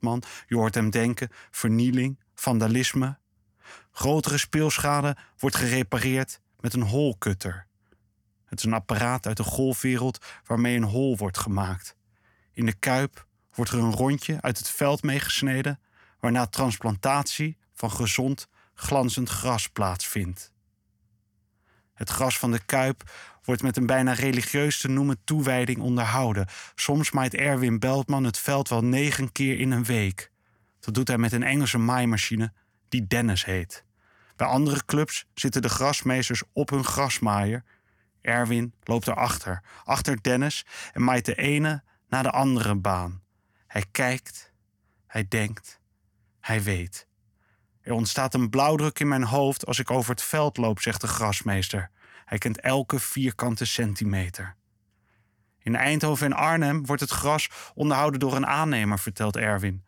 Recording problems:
none

